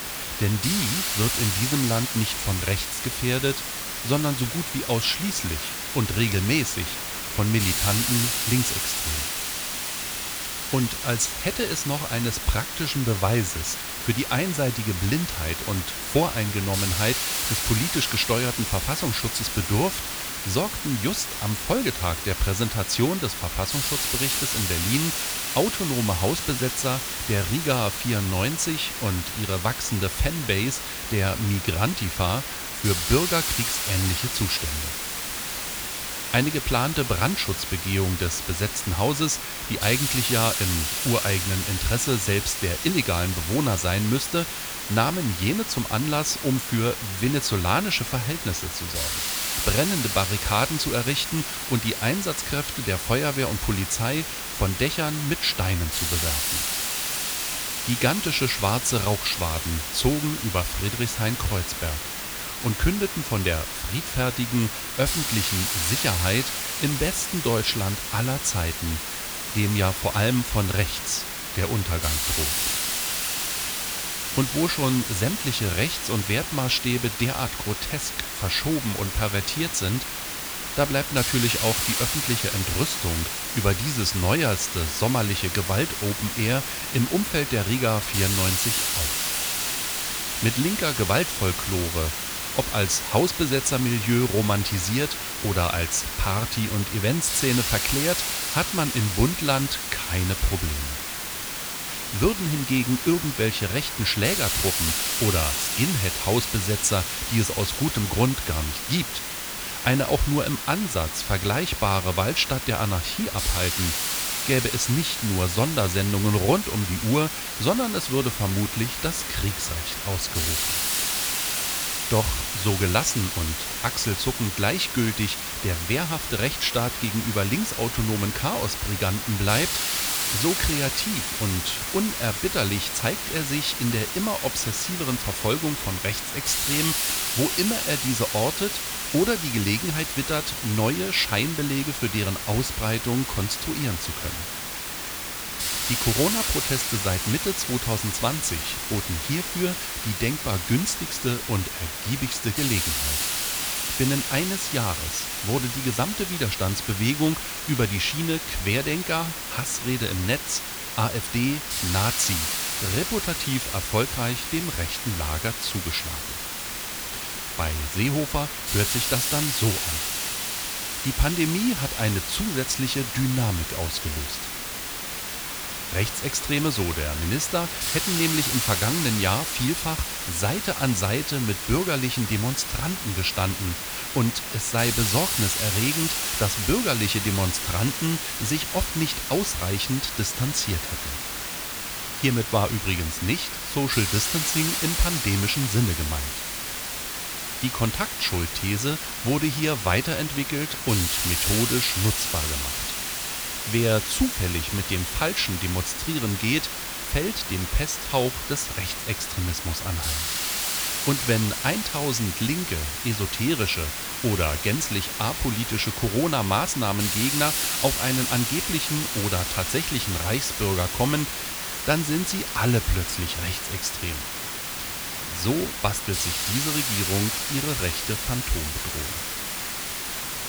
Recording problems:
hiss; loud; throughout; 1 dB below the speech
high-pitched whine; very faint; throughout; 3.5 kHz, 35 dB below the speech

